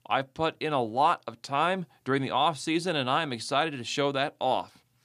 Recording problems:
none

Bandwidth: 15 kHz